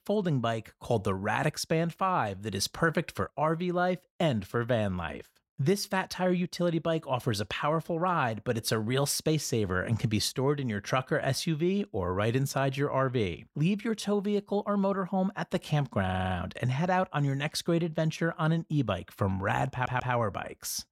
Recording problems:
audio stuttering; at 16 s and at 20 s

